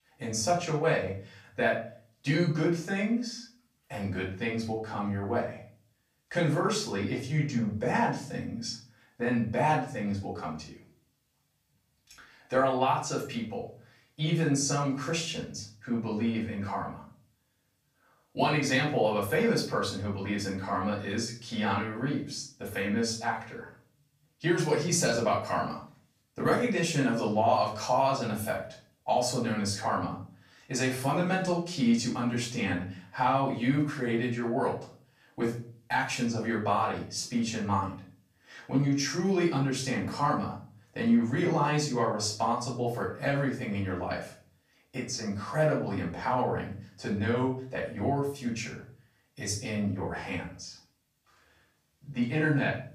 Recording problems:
off-mic speech; far
room echo; slight; dies away in 0.4 s

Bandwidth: 15 kHz